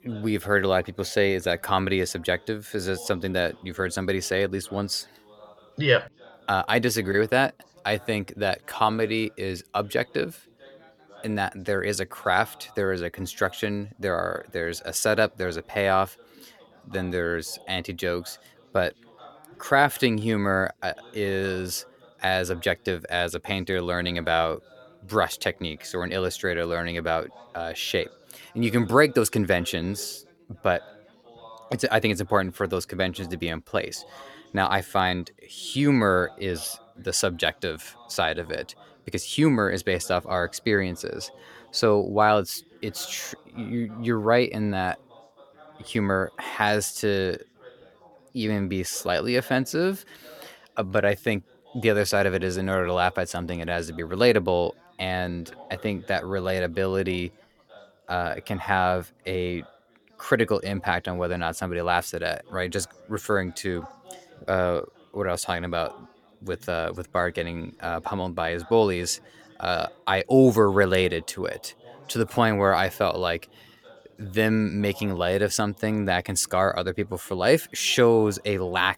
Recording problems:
background chatter; faint; throughout; 4 voices, 25 dB below the speech

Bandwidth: 17.5 kHz